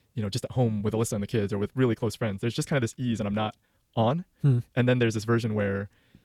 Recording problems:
wrong speed, natural pitch; too fast; 1.6 times normal speed

